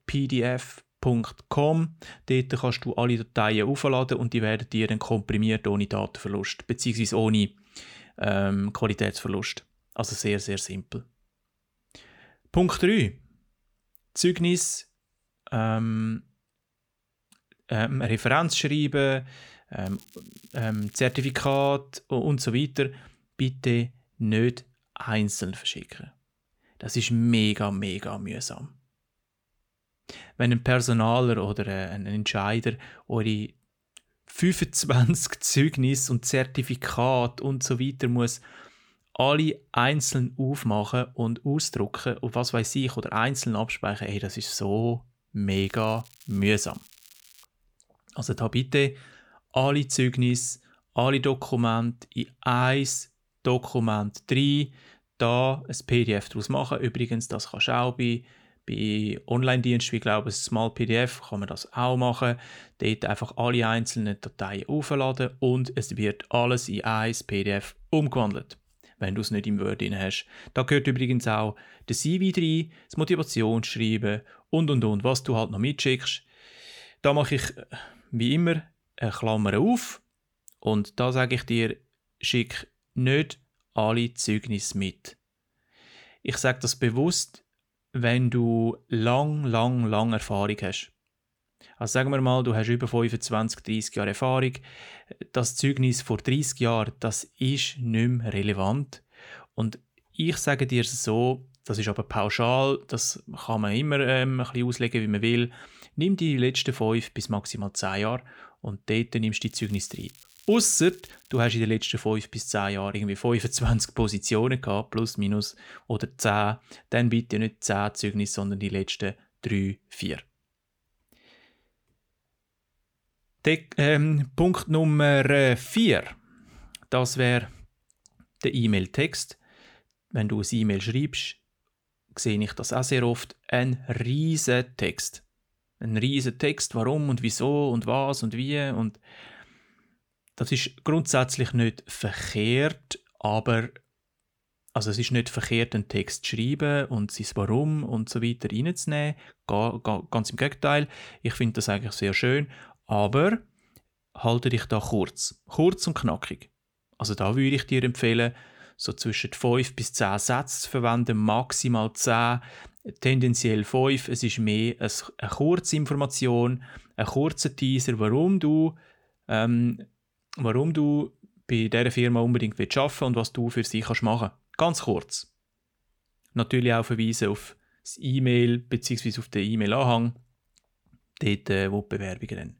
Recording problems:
crackling; faint; from 20 to 22 s, from 46 to 47 s and from 1:49 to 1:51; 25 dB below the speech

